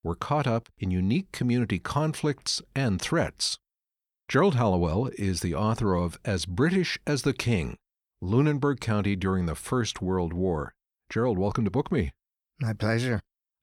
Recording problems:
none

